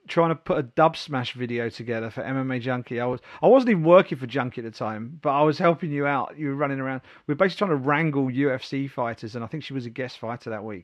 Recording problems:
muffled; very slightly; fading above 3 kHz

